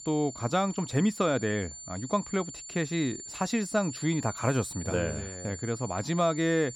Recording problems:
high-pitched whine; noticeable; throughout; 7 kHz, 10 dB below the speech

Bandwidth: 17 kHz